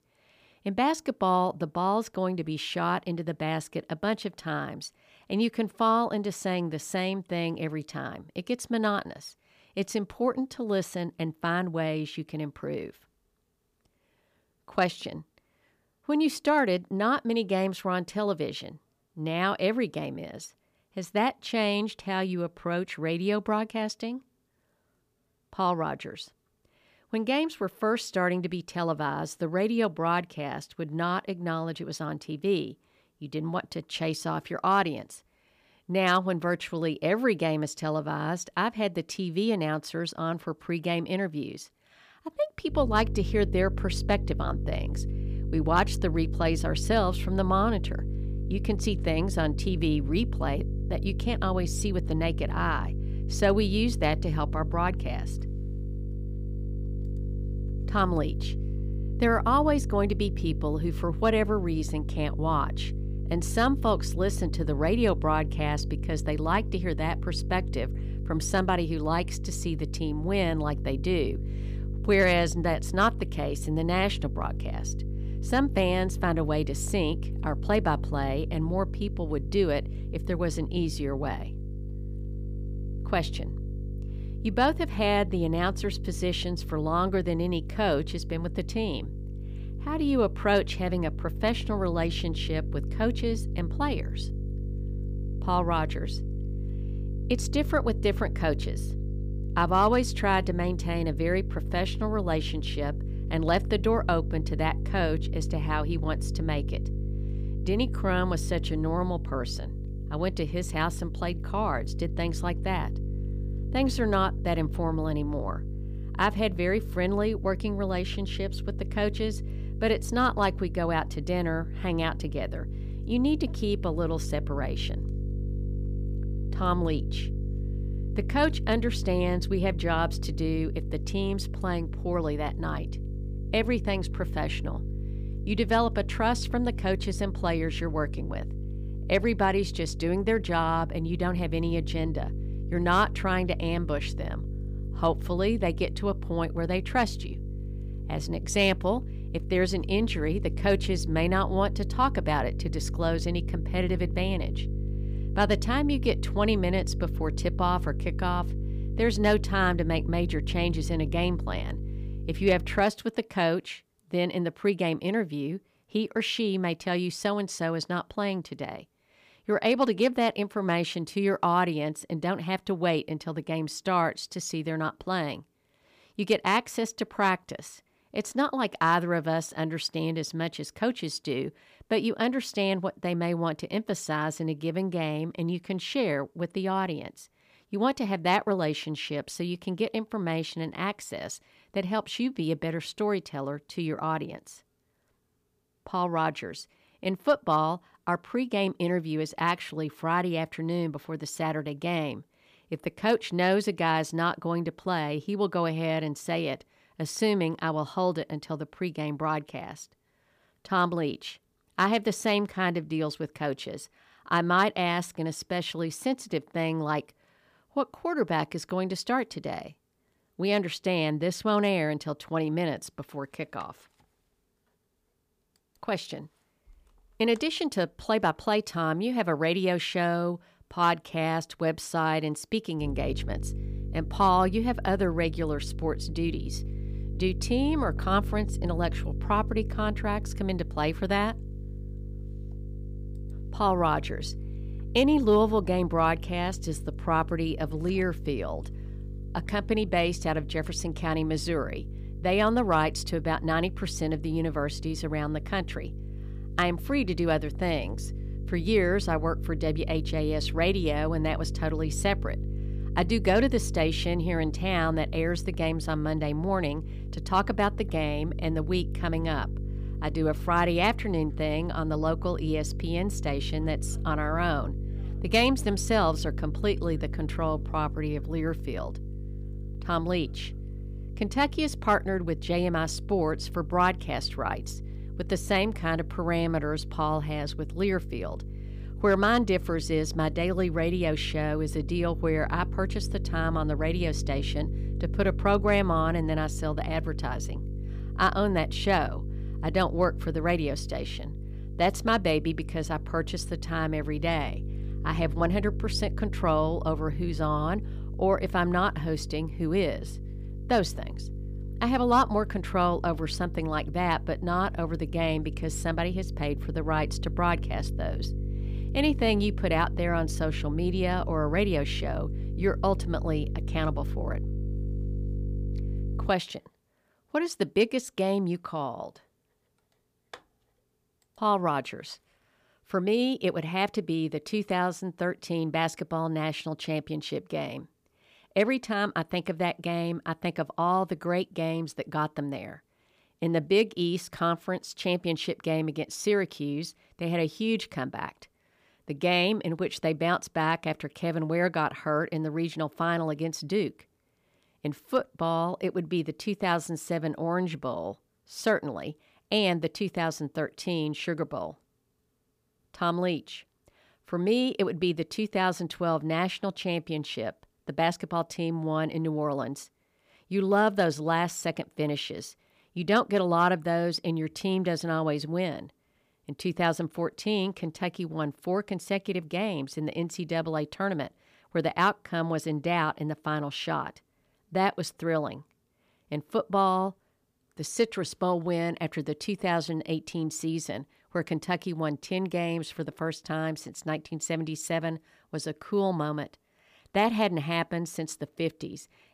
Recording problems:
electrical hum; noticeable; from 43 s to 2:43 and from 3:53 to 5:26; 50 Hz, 20 dB below the speech

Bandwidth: 15 kHz